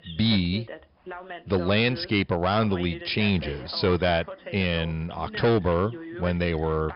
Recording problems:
high frequencies cut off; noticeable; nothing above 5.5 kHz
distortion; slight; 5% of the sound clipped
voice in the background; noticeable; throughout; 15 dB below the speech

